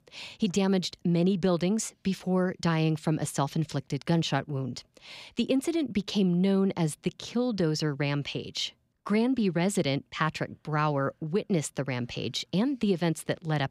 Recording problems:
none

